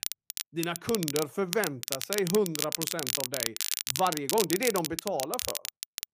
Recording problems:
crackle, like an old record; loud; 1 dB below the speech

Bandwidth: 15 kHz